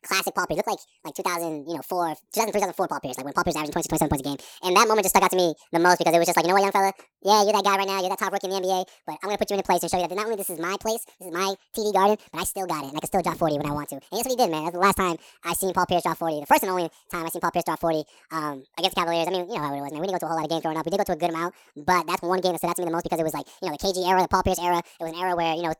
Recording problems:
wrong speed and pitch; too fast and too high; 1.6 times normal speed

